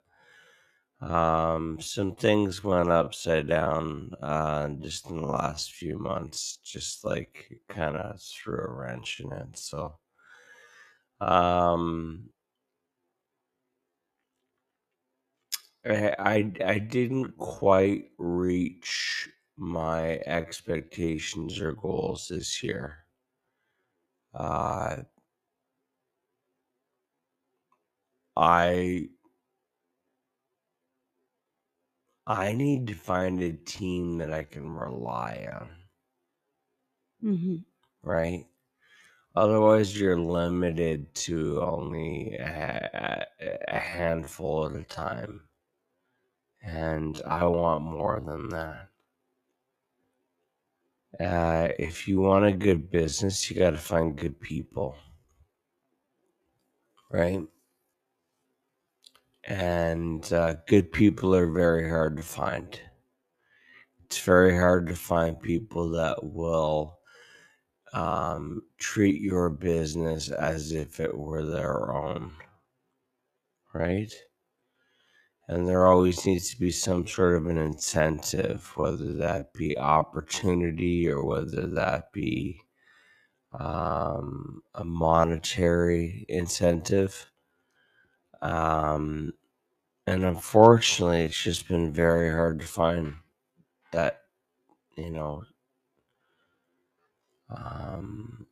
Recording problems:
wrong speed, natural pitch; too slow; 0.5 times normal speed

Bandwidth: 14.5 kHz